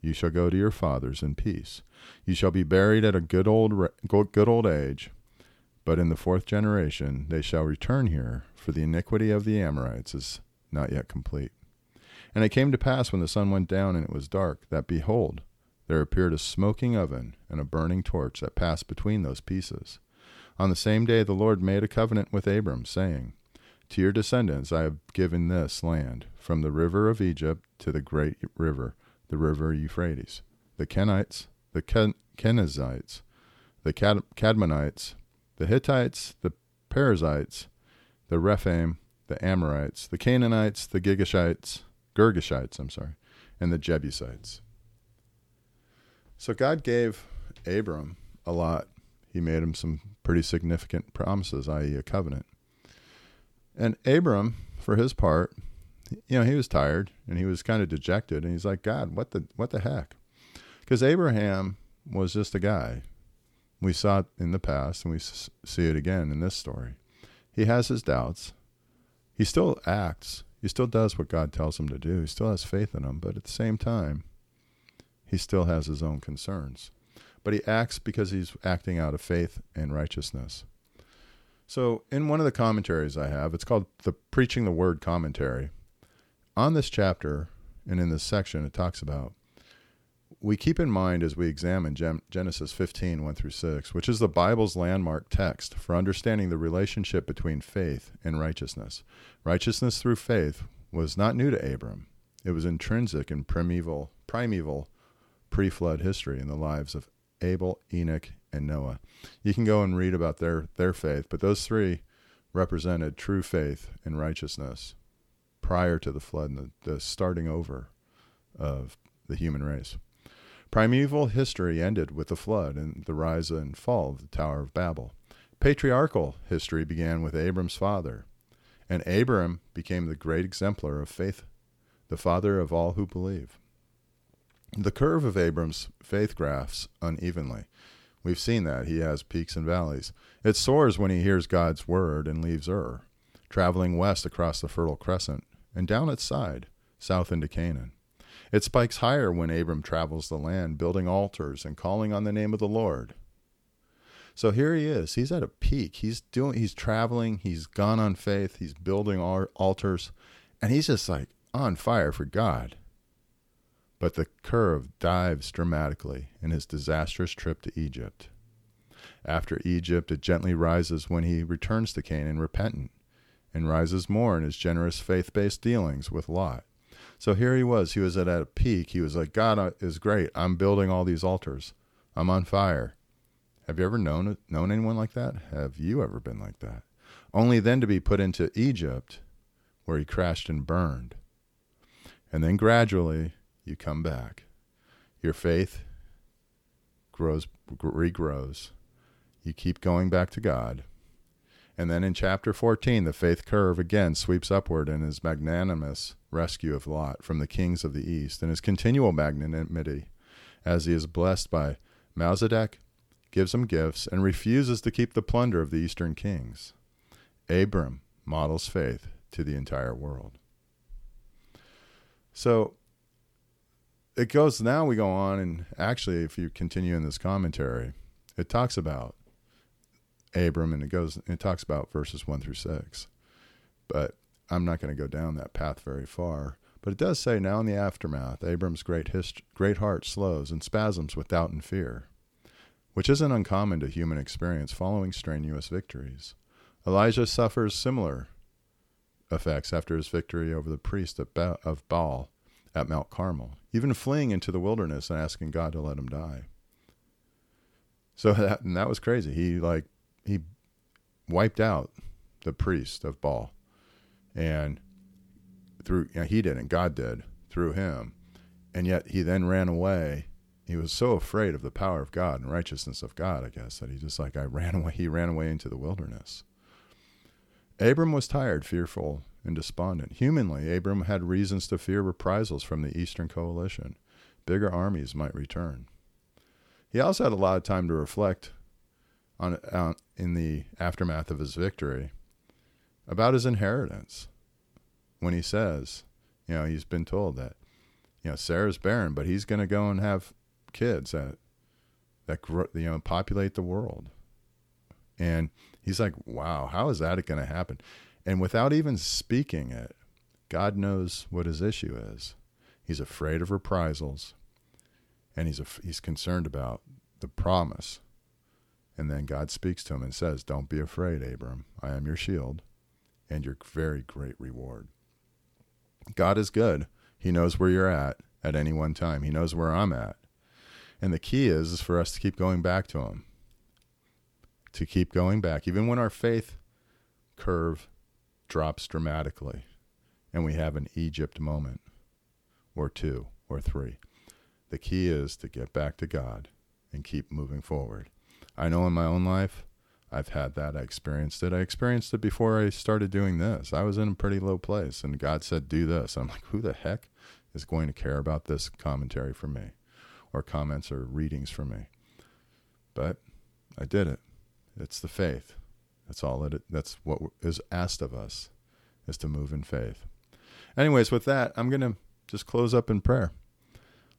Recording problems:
none

